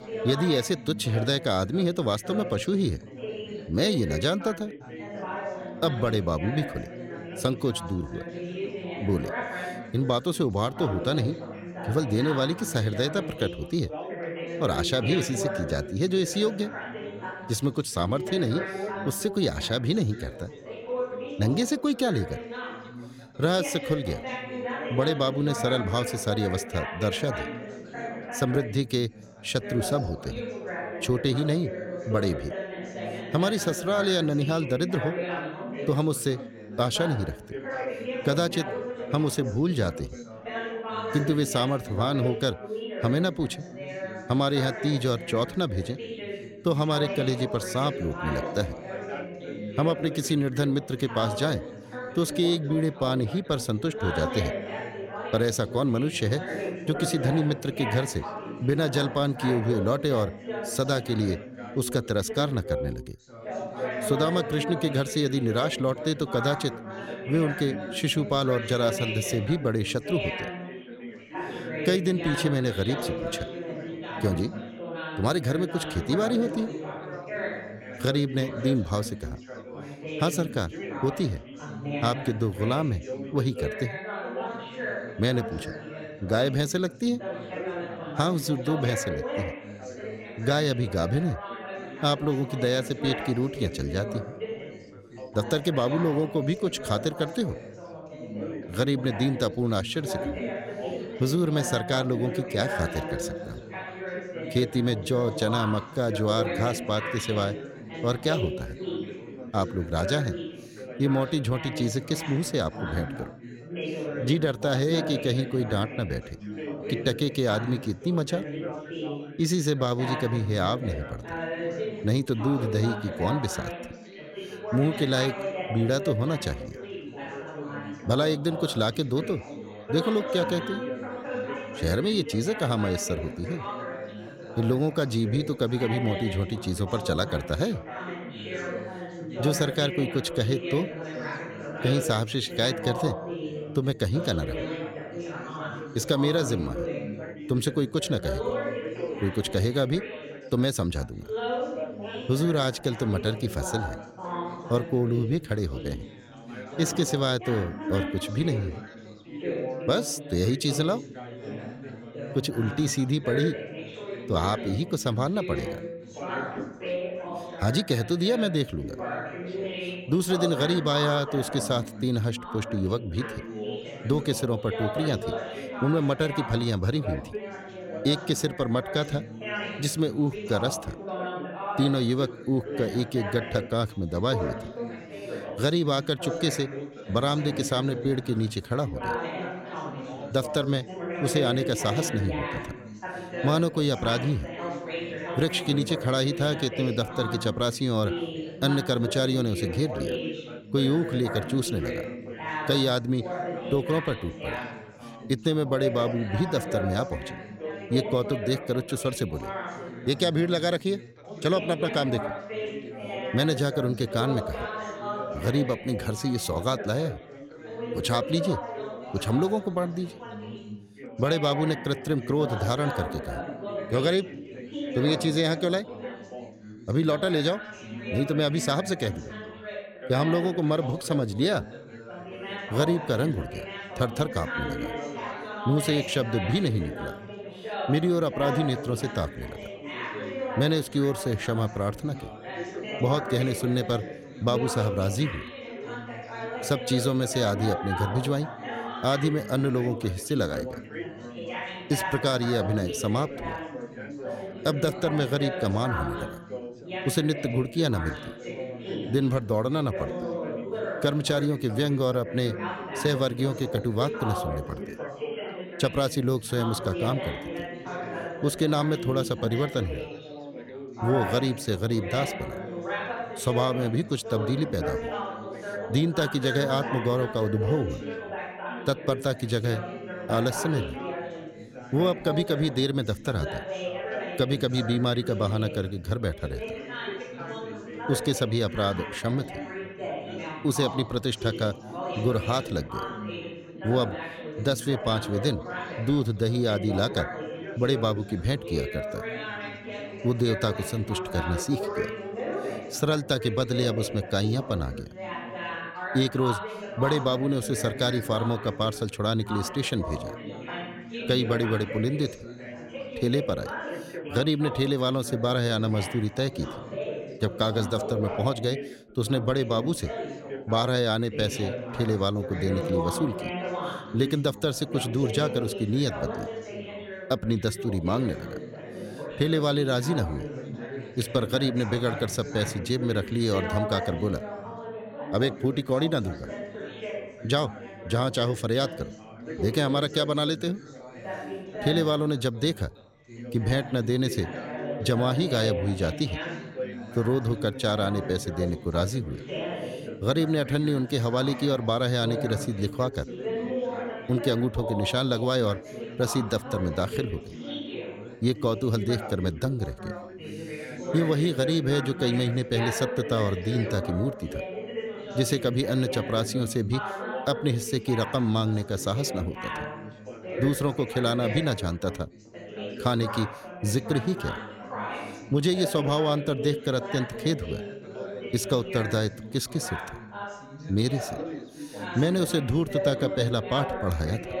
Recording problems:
background chatter; loud; throughout; 4 voices, 8 dB below the speech

